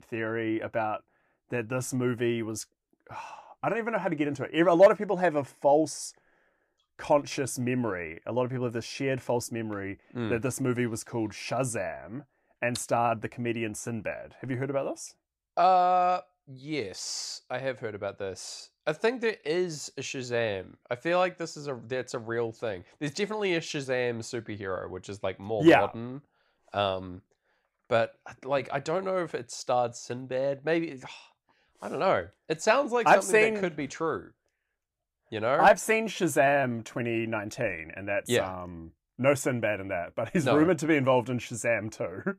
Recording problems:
none

